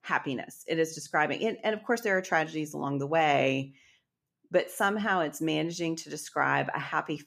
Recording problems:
none

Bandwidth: 14.5 kHz